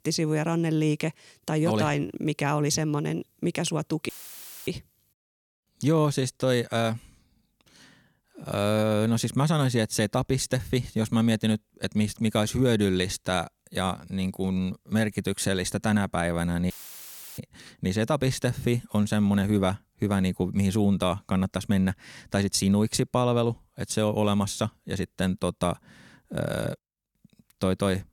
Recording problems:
audio cutting out; filled with static; at 4 s for 0.5 s and at 17 s for 0.5 s

